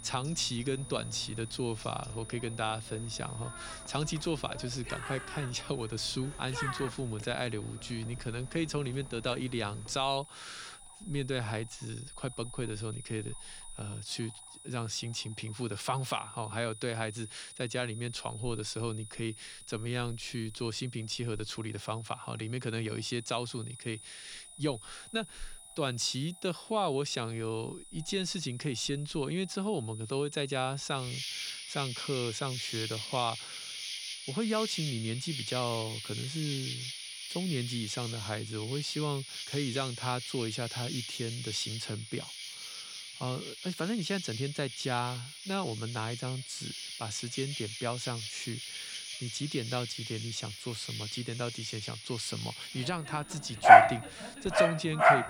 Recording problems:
animal sounds; very loud; throughout; 3 dB above the speech
high-pitched whine; noticeable; throughout; 9.5 kHz, 15 dB below the speech

